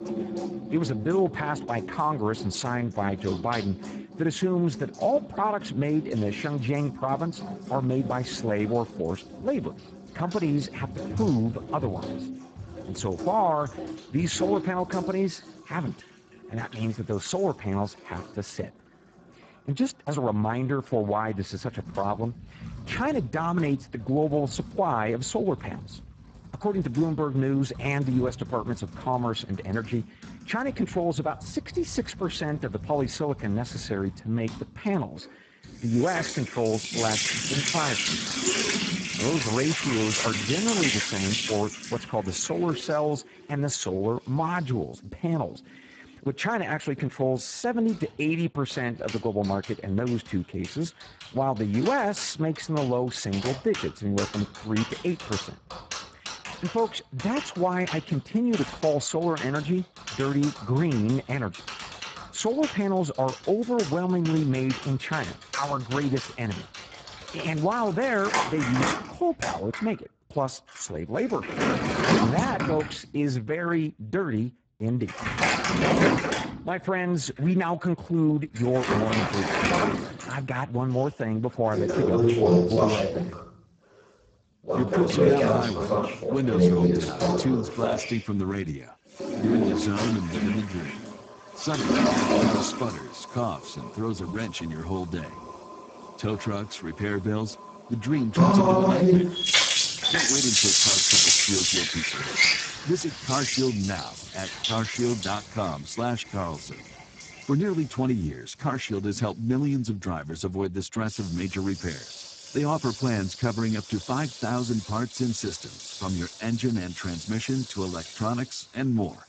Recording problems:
garbled, watery; badly; nothing above 7.5 kHz
household noises; very loud; throughout; 2 dB above the speech

